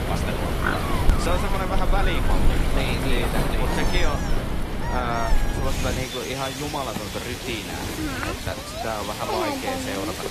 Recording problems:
garbled, watery; slightly; nothing above 14.5 kHz
animal sounds; very loud; throughout; 2 dB above the speech
wind noise on the microphone; heavy; until 6 s; 10 dB below the speech
rain or running water; loud; throughout; as loud as the speech

